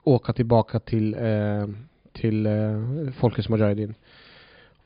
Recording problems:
high frequencies cut off; severe; nothing above 5 kHz

